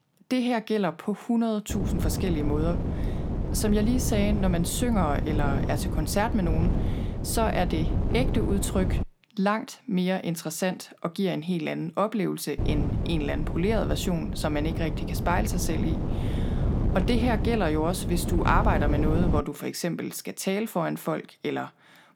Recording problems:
wind noise on the microphone; heavy; from 1.5 to 9 s and from 13 to 19 s; 8 dB below the speech

